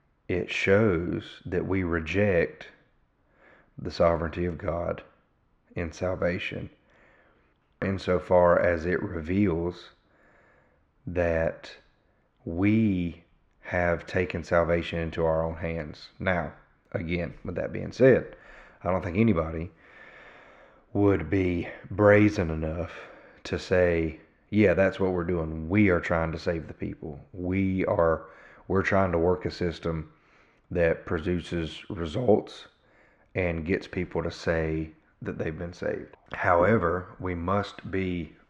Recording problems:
muffled; slightly; fading above 2.5 kHz

